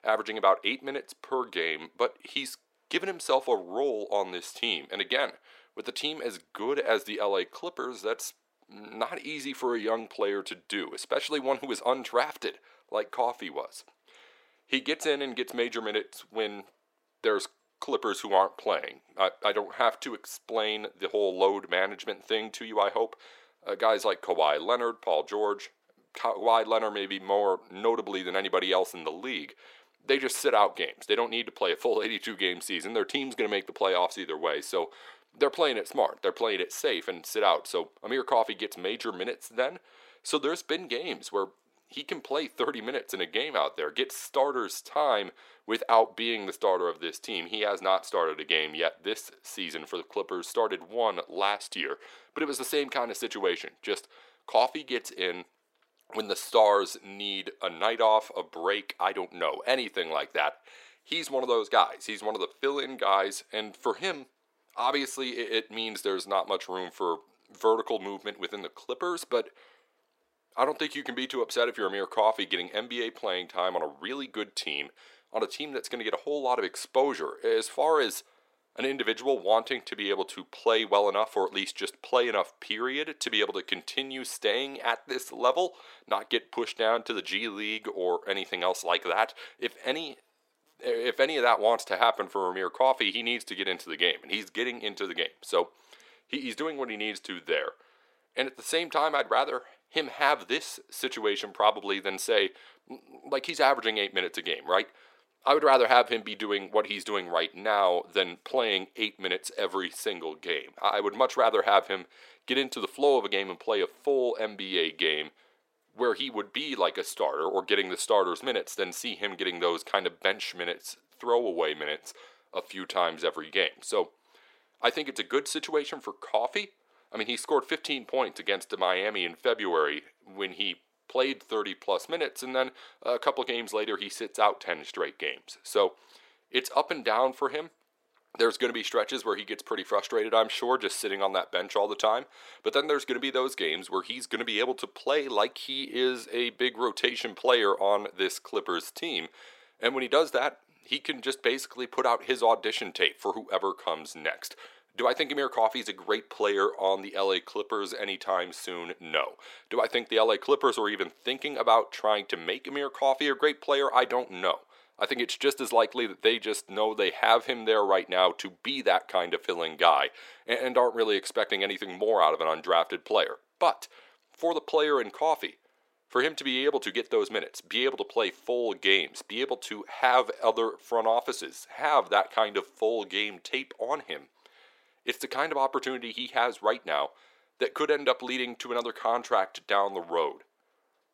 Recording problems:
thin; somewhat; fading below 400 Hz

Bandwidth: 16 kHz